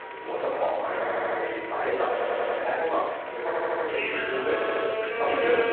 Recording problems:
room echo; strong; dies away in 1 s
off-mic speech; far
phone-call audio; nothing above 4 kHz
background music; loud; throughout; 7 dB below the speech
chatter from many people; loud; throughout; 4 dB below the speech
audio stuttering; 4 times, first at 1 s

